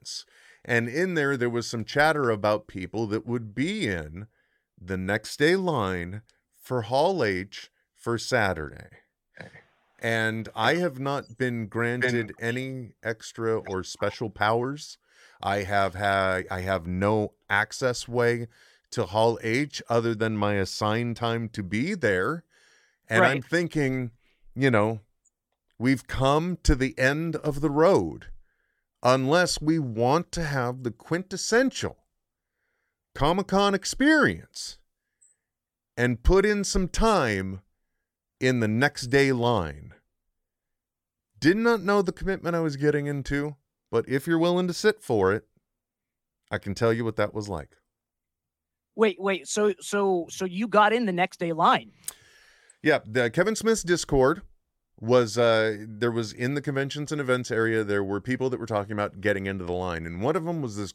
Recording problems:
none

